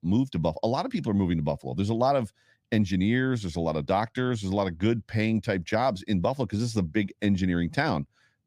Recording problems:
none

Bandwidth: 15 kHz